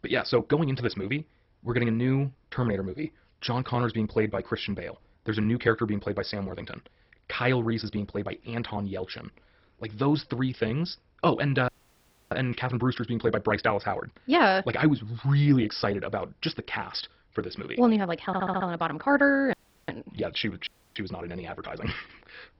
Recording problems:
garbled, watery; badly; nothing above 5.5 kHz
wrong speed, natural pitch; too fast; 1.5 times normal speed
audio cutting out; at 12 s for 0.5 s, at 20 s and at 21 s
audio stuttering; at 18 s

